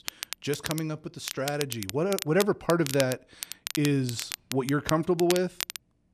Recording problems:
crackle, like an old record; loud; 8 dB below the speech

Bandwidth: 14 kHz